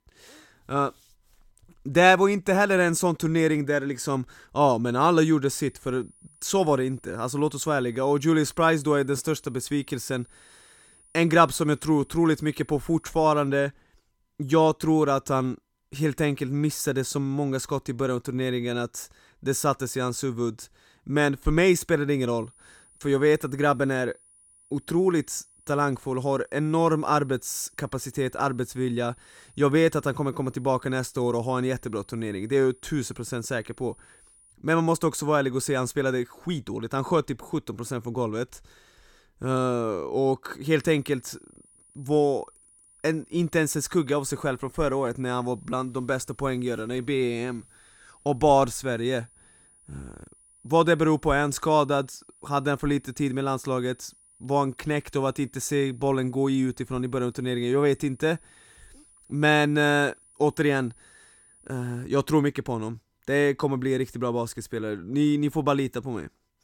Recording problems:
high-pitched whine; faint; from 5.5 to 13 s, from 22 to 35 s and from 41 s to 1:02; 9.5 kHz, 30 dB below the speech

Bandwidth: 17 kHz